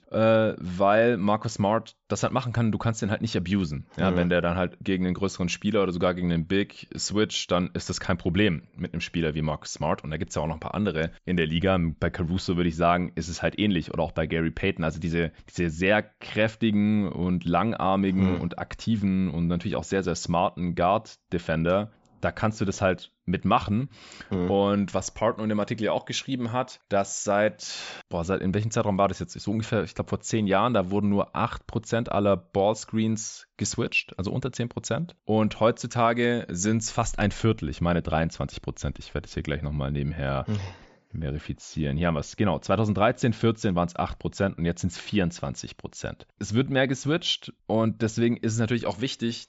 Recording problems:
high frequencies cut off; noticeable; nothing above 8 kHz

